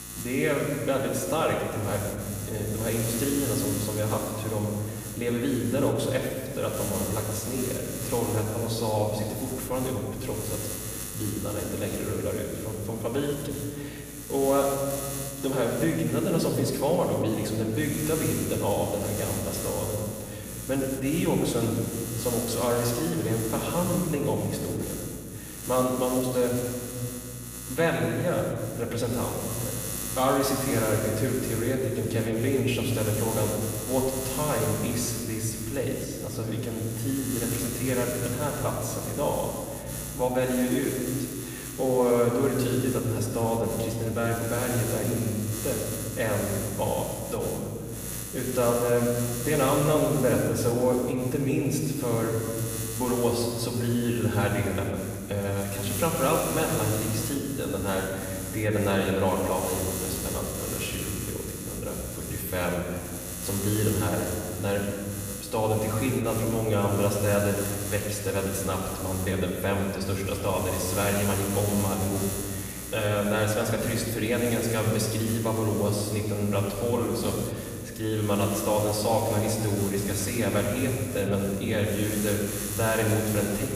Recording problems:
off-mic speech; far
room echo; noticeable; dies away in 1.8 s
electrical hum; loud; throughout; 60 Hz, 9 dB below the speech

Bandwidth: 15 kHz